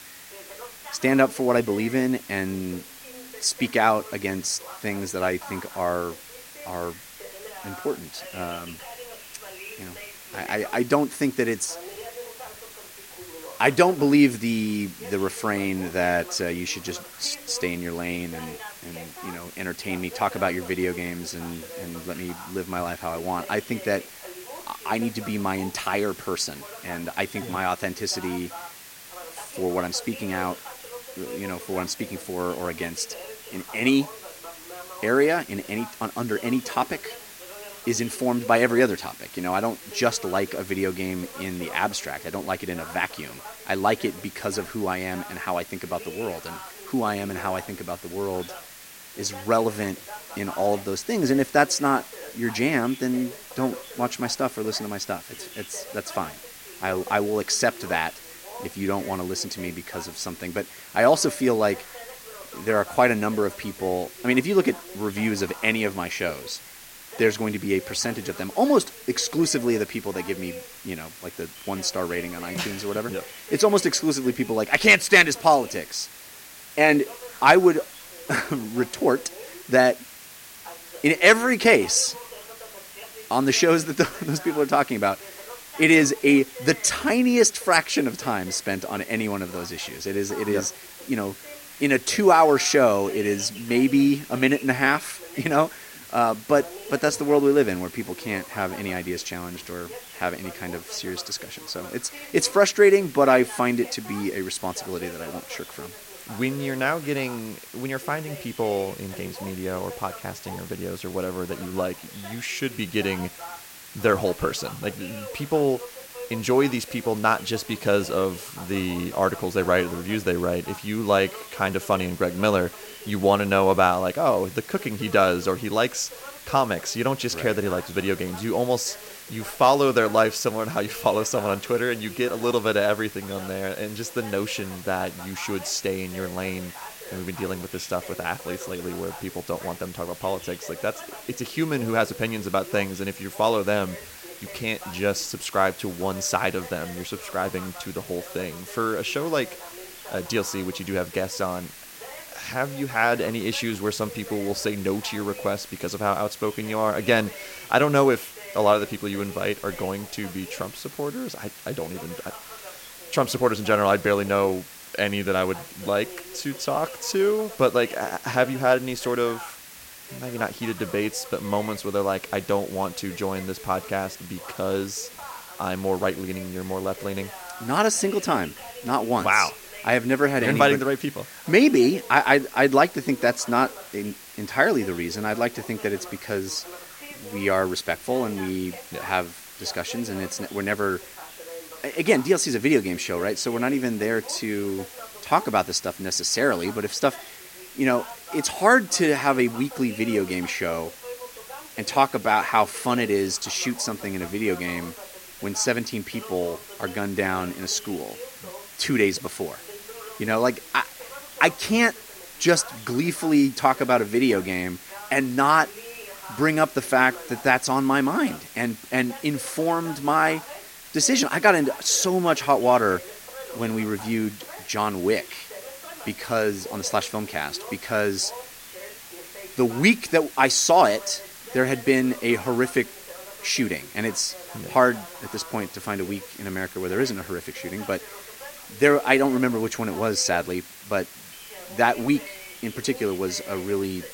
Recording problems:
voice in the background; noticeable; throughout; 20 dB below the speech
hiss; noticeable; throughout; 15 dB below the speech

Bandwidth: 16.5 kHz